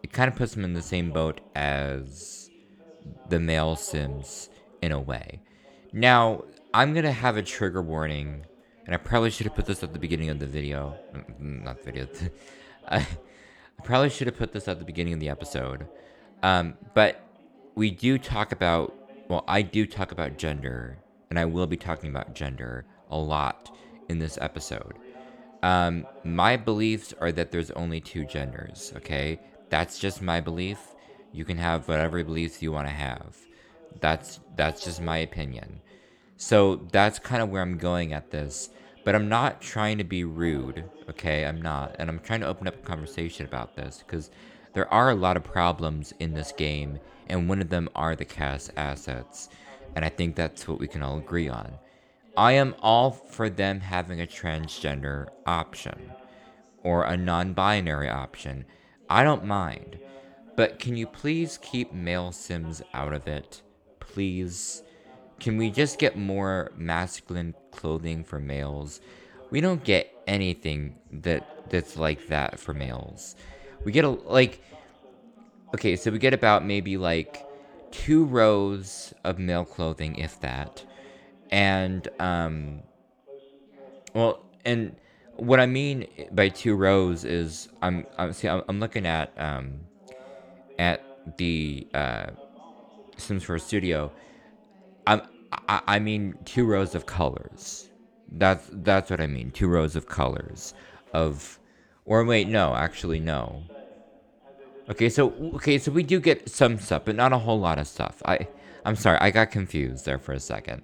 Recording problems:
background chatter; faint; throughout; 2 voices, 25 dB below the speech

